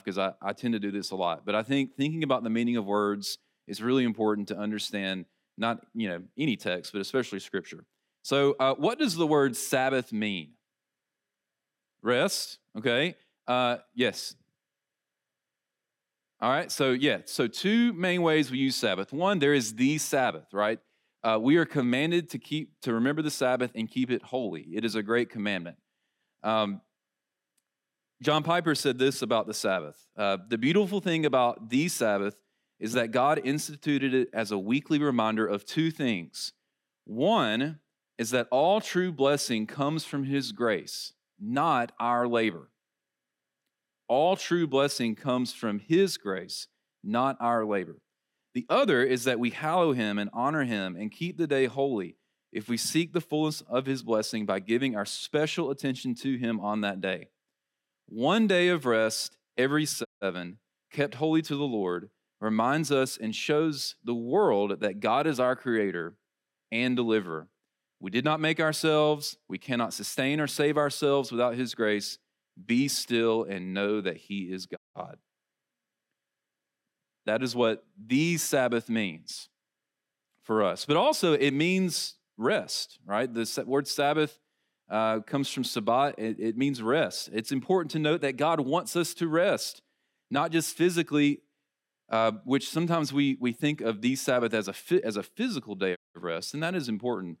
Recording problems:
audio cutting out; at 1:00, at 1:15 and at 1:36

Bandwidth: 16 kHz